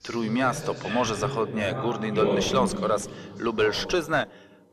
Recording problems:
distortion; slight; 9 dB below the speech
voice in the background; loud; throughout; 5 dB below the speech

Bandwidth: 13.5 kHz